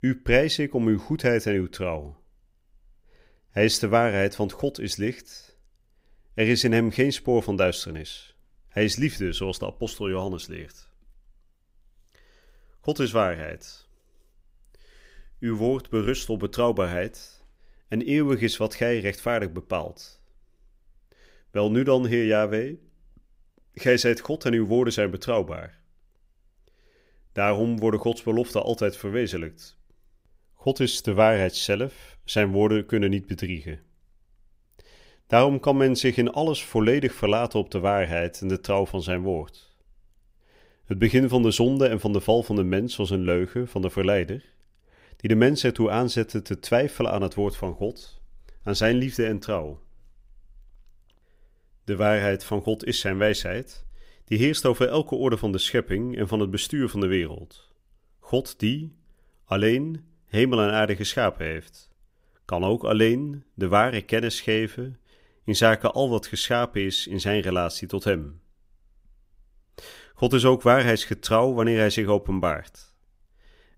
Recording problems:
none

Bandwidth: 15.5 kHz